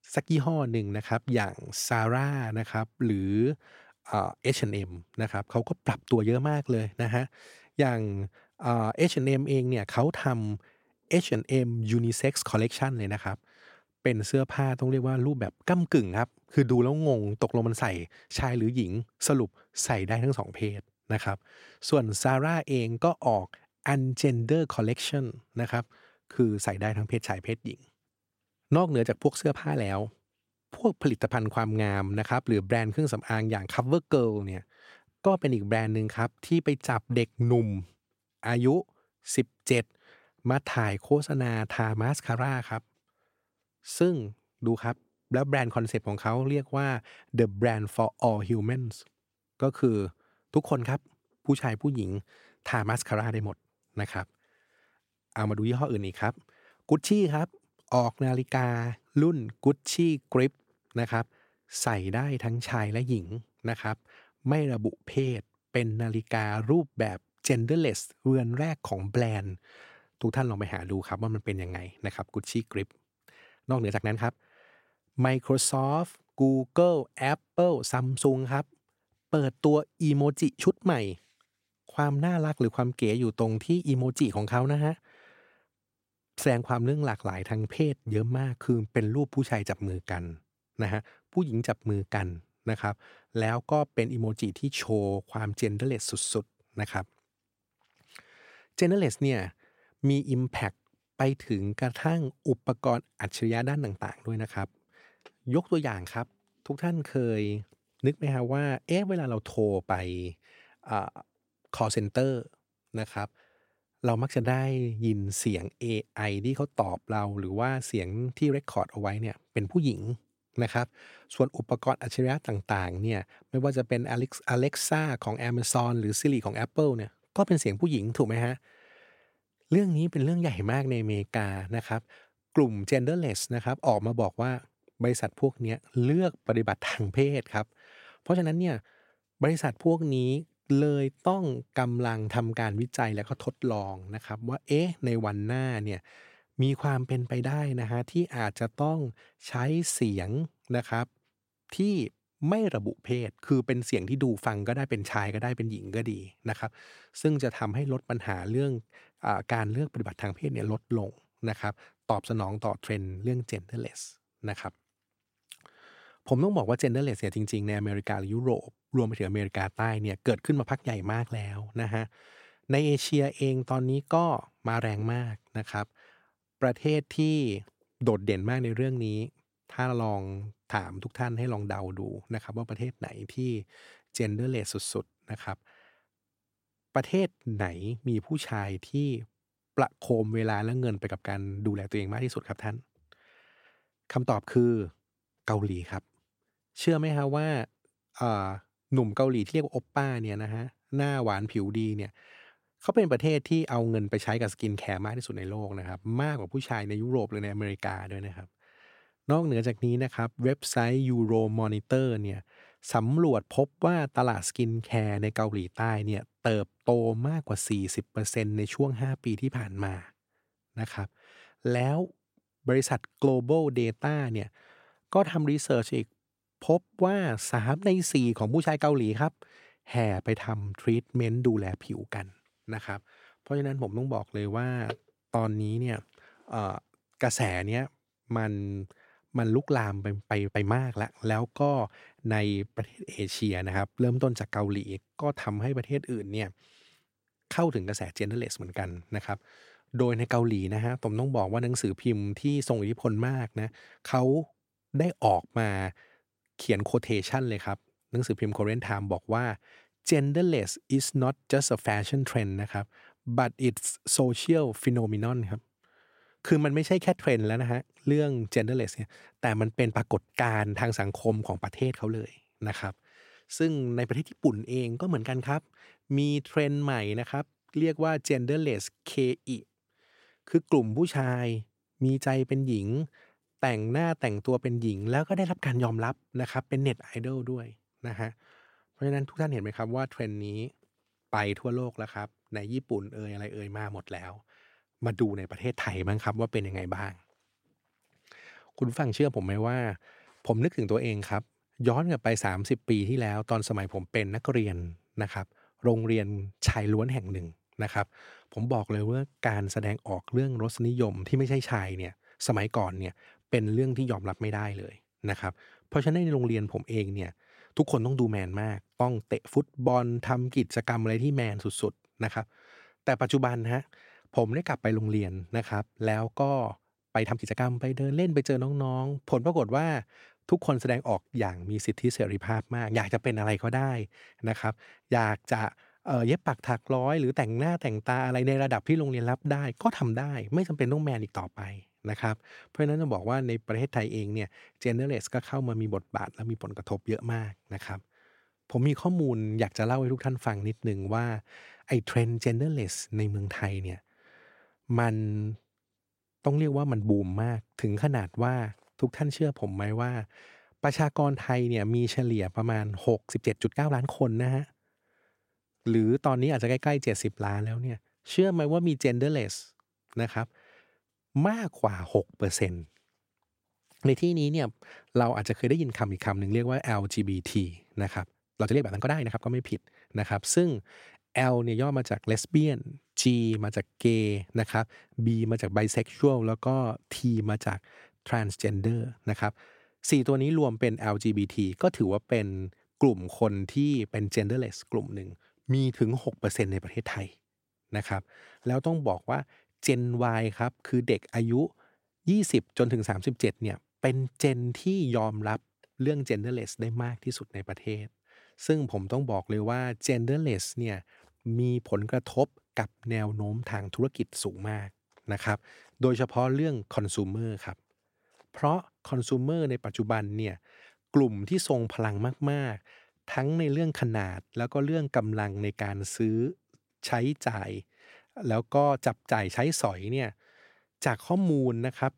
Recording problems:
uneven, jittery; strongly; from 1:14 to 7:04

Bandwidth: 16 kHz